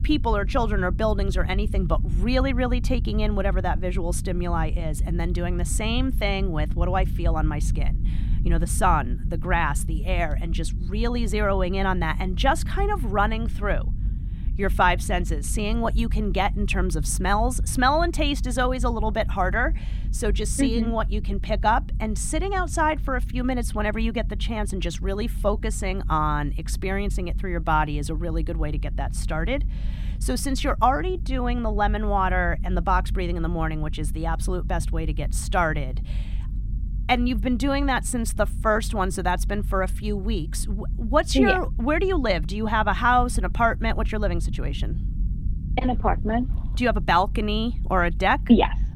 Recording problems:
low rumble; faint; throughout; 20 dB below the speech

